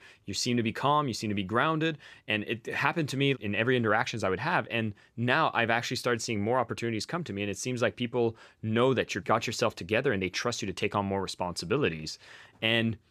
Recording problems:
none

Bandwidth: 14.5 kHz